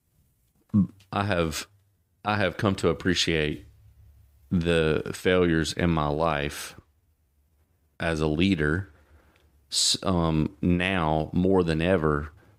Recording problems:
none

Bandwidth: 15.5 kHz